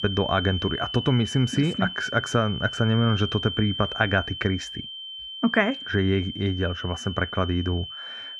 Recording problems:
muffled; very; fading above 3 kHz
high-pitched whine; loud; throughout; 3 kHz, 8 dB below the speech

